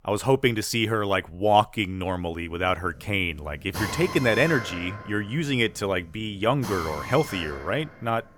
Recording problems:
machinery noise; noticeable; from 2 s on; 10 dB below the speech

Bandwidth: 18.5 kHz